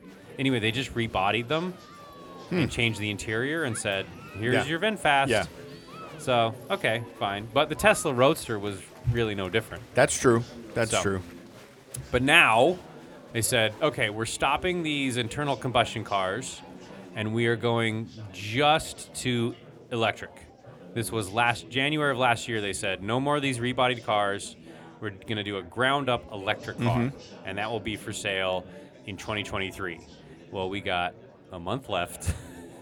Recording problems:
chatter from many people; noticeable; throughout; 20 dB below the speech

